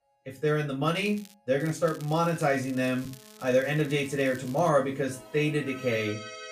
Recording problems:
off-mic speech; far
room echo; very slight; dies away in 0.2 s
background music; noticeable; throughout; 20 dB below the speech
crackling; faint; at 1 s and from 1.5 to 4.5 s; 20 dB below the speech

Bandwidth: 15 kHz